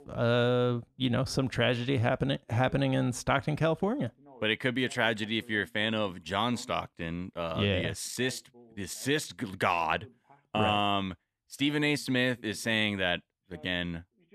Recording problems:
voice in the background; faint; throughout; 25 dB below the speech

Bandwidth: 14 kHz